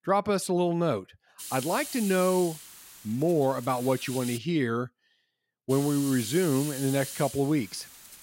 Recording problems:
hiss; noticeable; from 1.5 to 4.5 s and from 5.5 s on; 10 dB below the speech

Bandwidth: 16 kHz